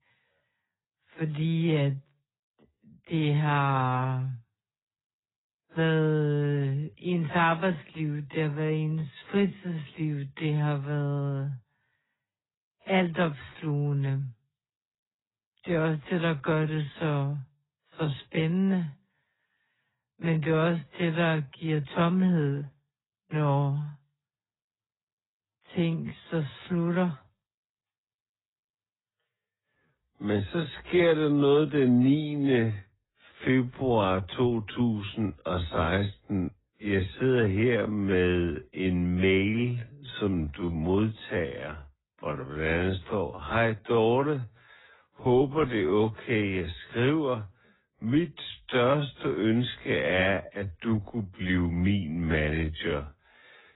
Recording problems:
garbled, watery; badly; nothing above 4 kHz
wrong speed, natural pitch; too slow; 0.5 times normal speed

